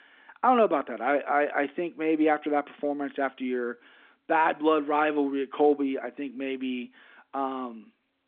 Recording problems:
phone-call audio

